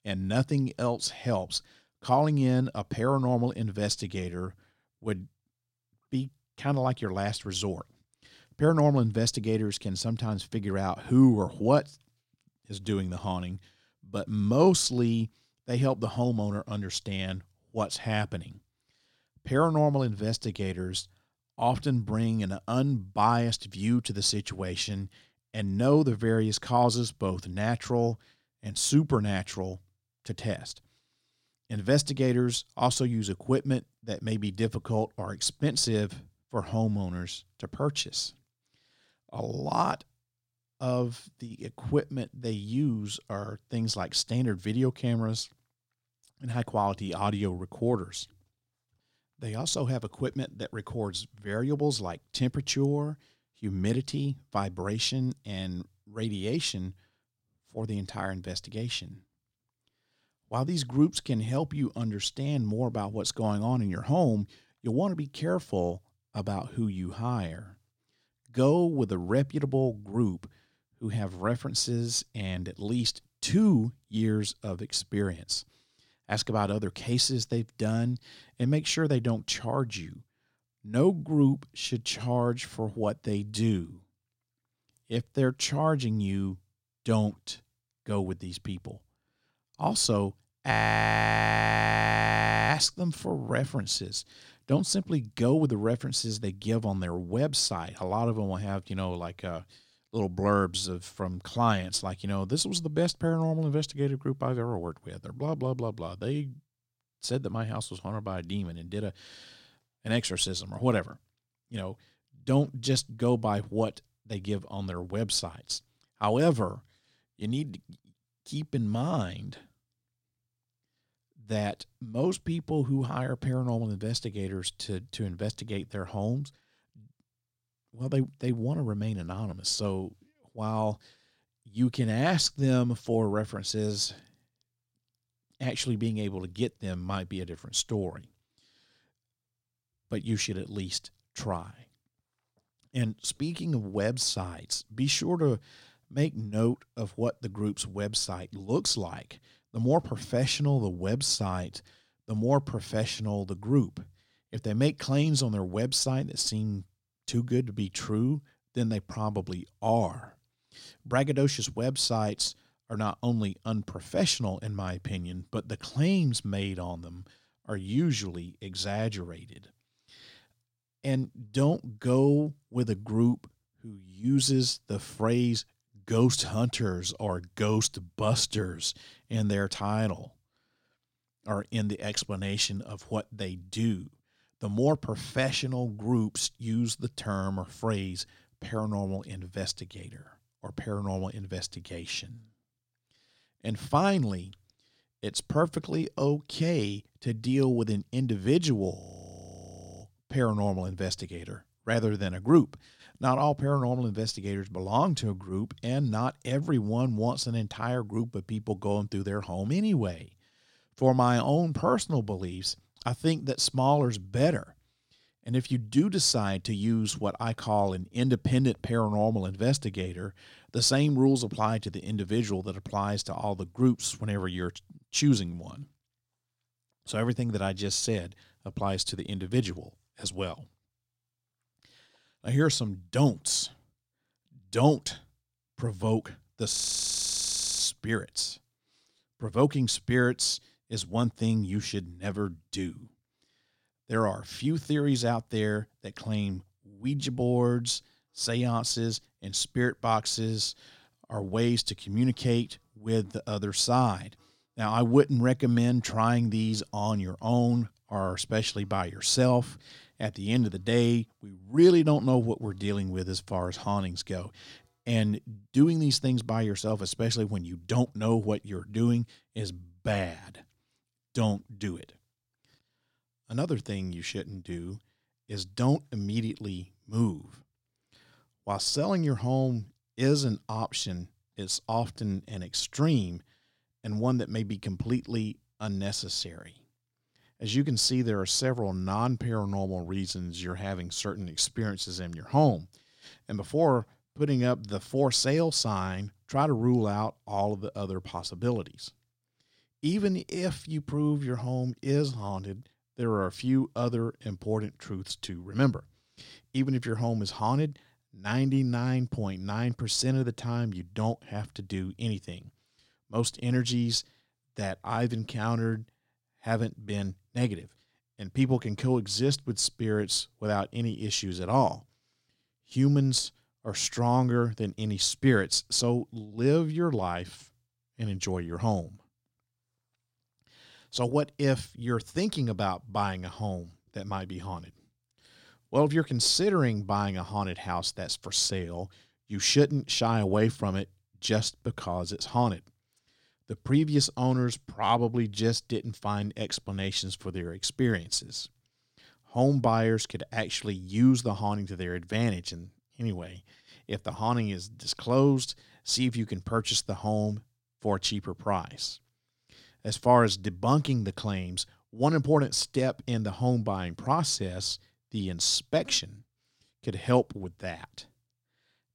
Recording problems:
audio freezing; at 1:31 for 2 s, at 3:19 for 1 s and at 3:57 for 1 s

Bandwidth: 16.5 kHz